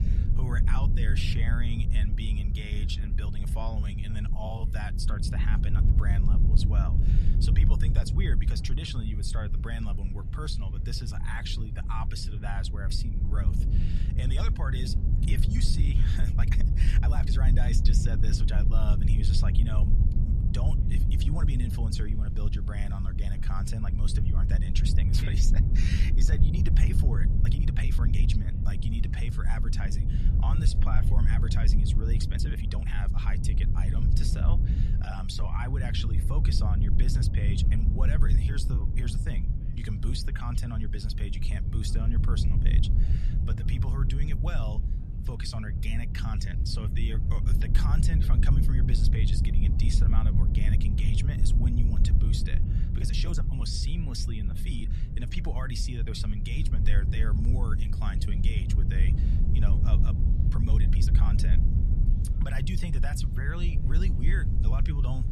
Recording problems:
low rumble; loud; throughout; 3 dB below the speech
murmuring crowd; faint; throughout; 30 dB below the speech
uneven, jittery; strongly; from 4.5 s to 1:01

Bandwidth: 14 kHz